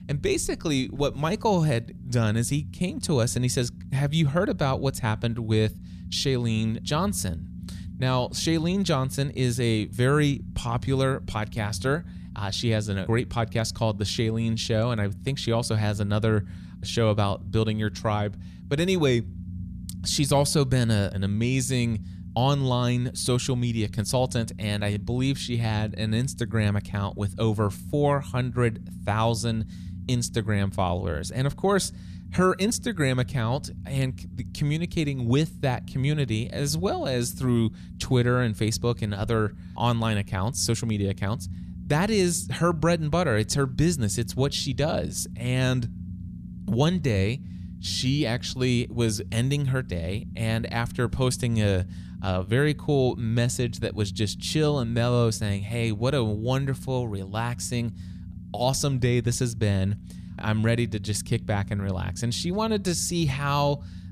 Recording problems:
low rumble; faint; throughout; 20 dB below the speech

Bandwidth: 14.5 kHz